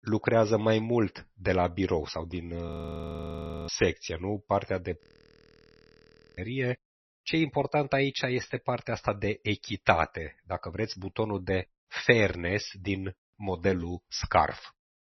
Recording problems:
garbled, watery; slightly; nothing above 6 kHz
audio freezing; at 2.5 s for 1 s and at 5 s for 1.5 s

